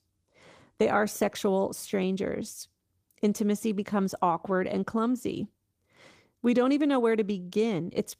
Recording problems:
garbled, watery; slightly; nothing above 15 kHz

